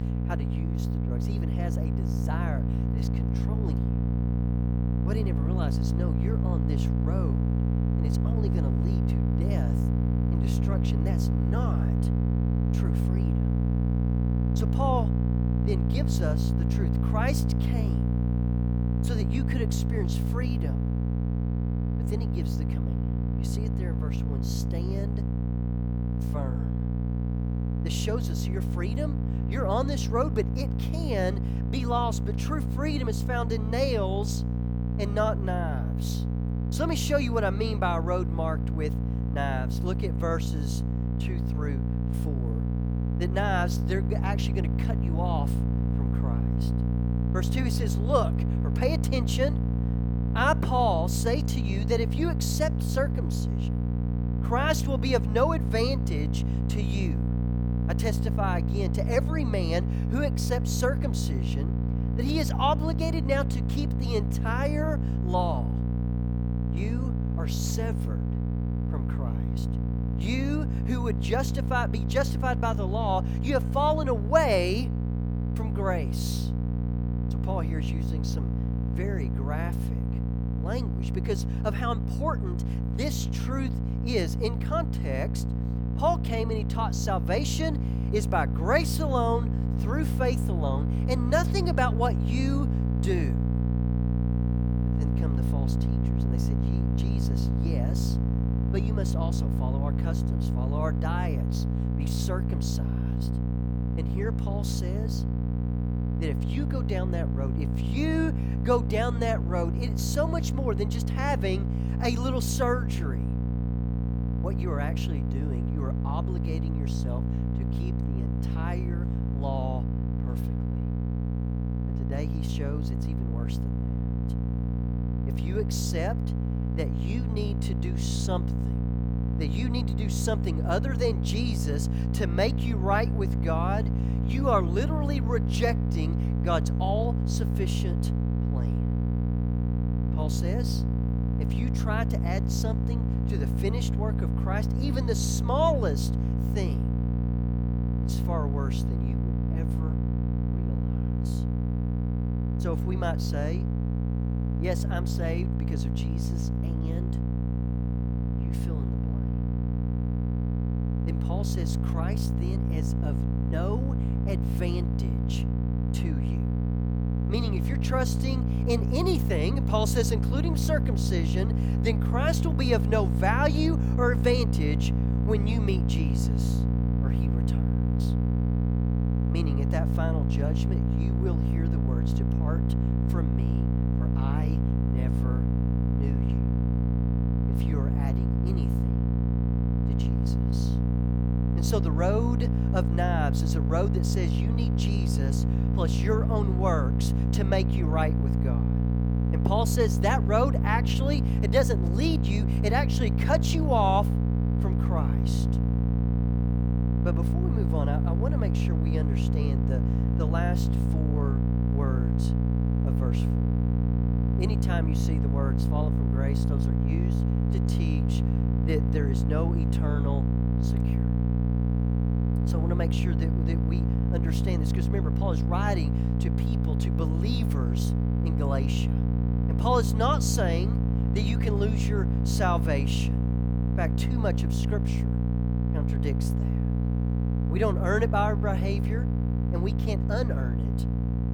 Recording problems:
electrical hum; loud; throughout; 60 Hz, 6 dB below the speech

